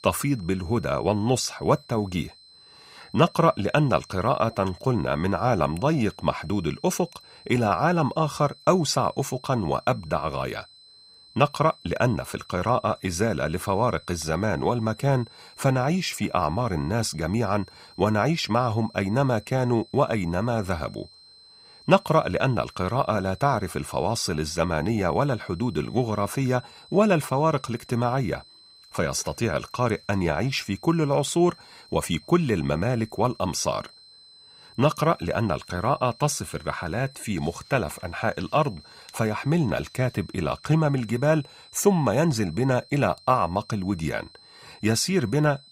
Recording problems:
high-pitched whine; faint; throughout; 4 kHz, 25 dB below the speech

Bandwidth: 15.5 kHz